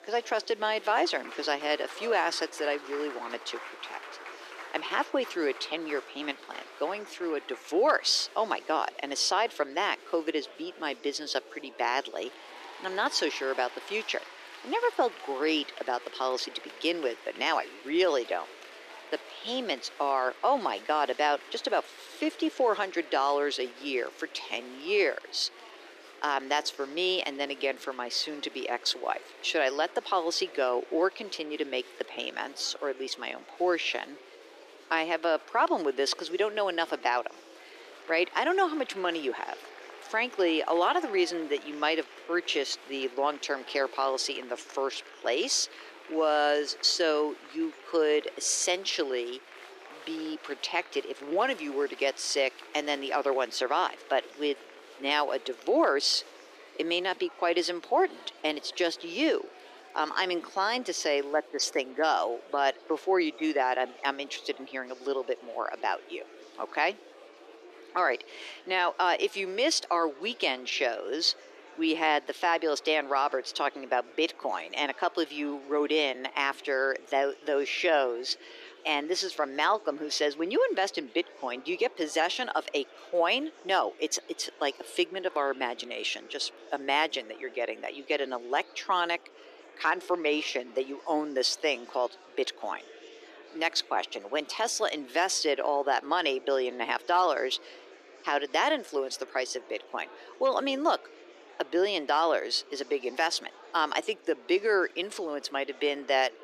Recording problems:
thin; very; fading below 350 Hz
murmuring crowd; noticeable; throughout; 20 dB below the speech

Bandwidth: 14.5 kHz